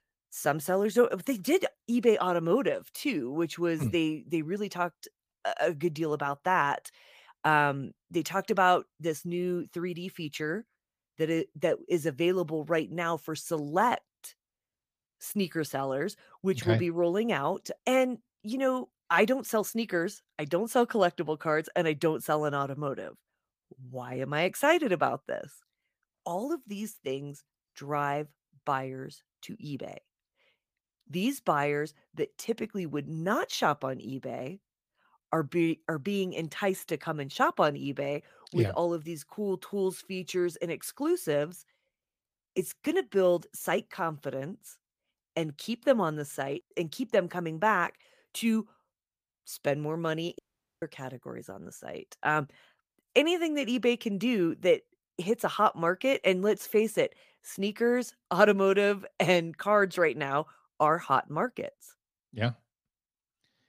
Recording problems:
audio cutting out; at 50 s

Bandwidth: 15 kHz